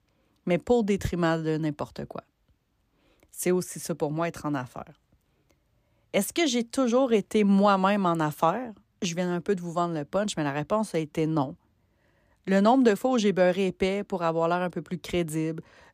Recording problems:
none

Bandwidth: 14.5 kHz